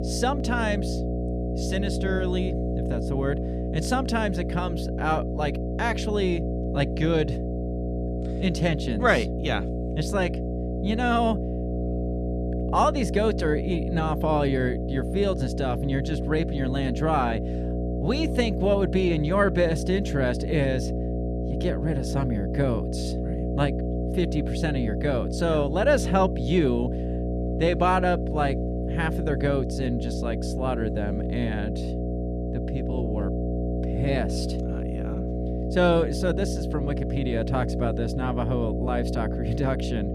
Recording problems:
electrical hum; loud; throughout; 60 Hz, 7 dB below the speech

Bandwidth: 14.5 kHz